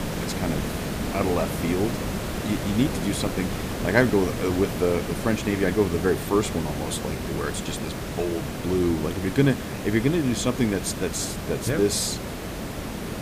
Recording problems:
hiss; loud; throughout; 5 dB below the speech

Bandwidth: 15 kHz